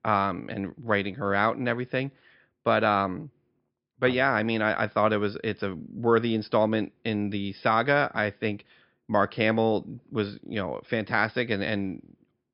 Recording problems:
high frequencies cut off; noticeable; nothing above 5.5 kHz

